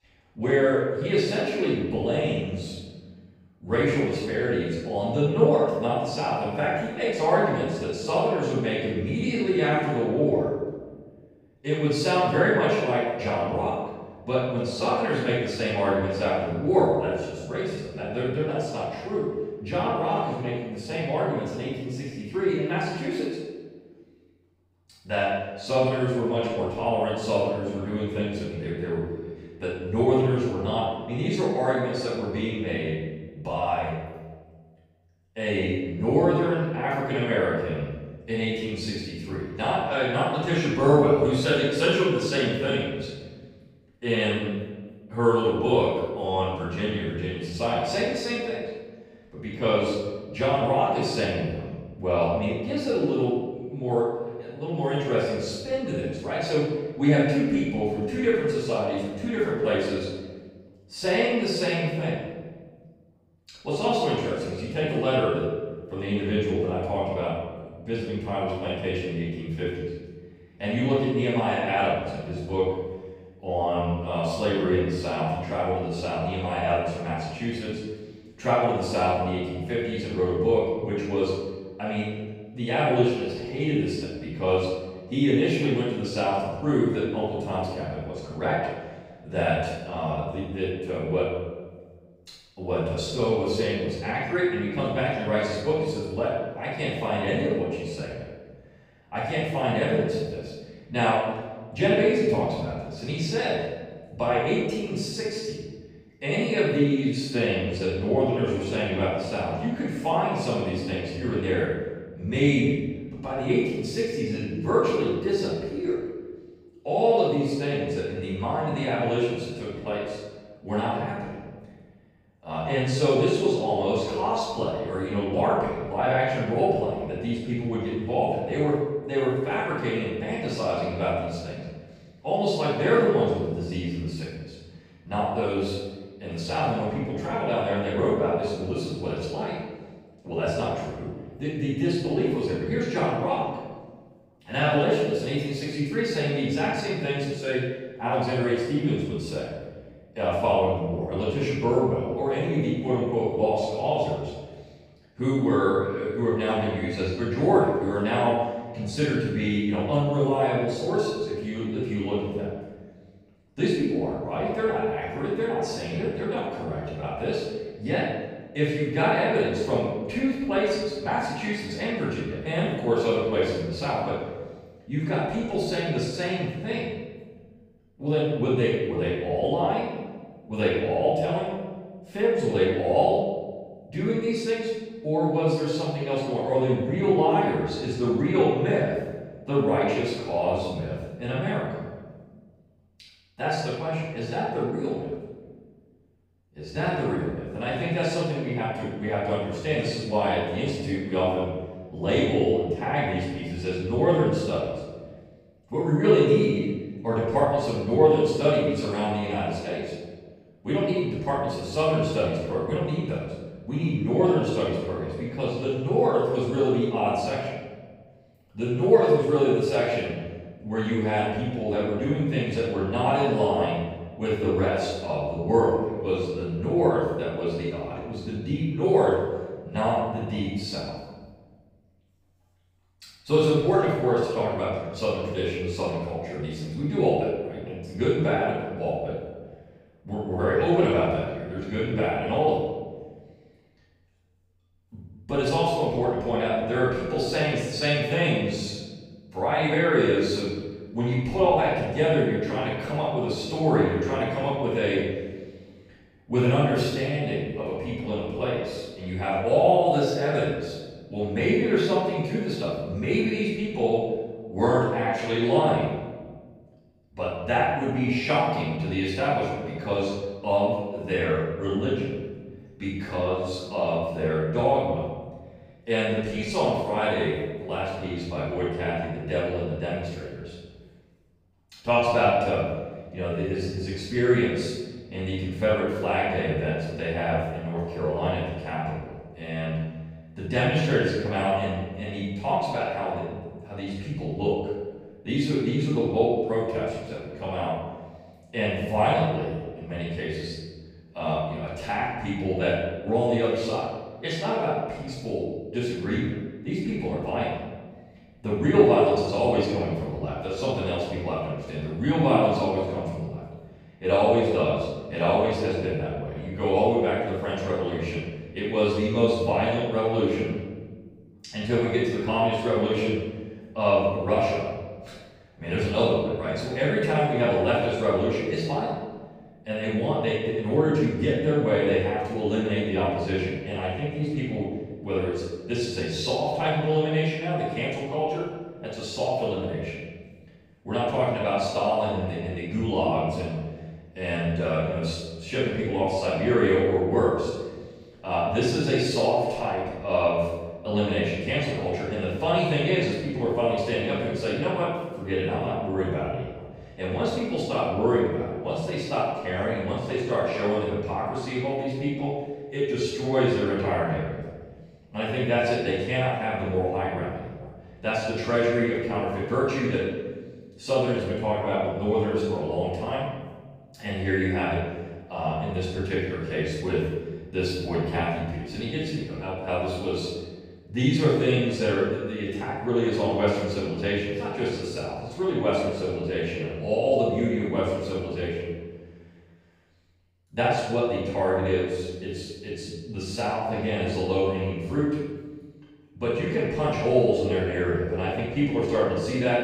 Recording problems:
room echo; strong; dies away in 1.2 s
off-mic speech; far

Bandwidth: 15.5 kHz